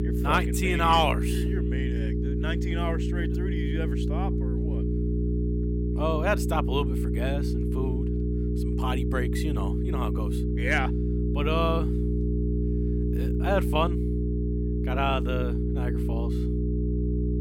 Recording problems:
electrical hum; loud; throughout; 60 Hz, 7 dB below the speech

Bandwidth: 16.5 kHz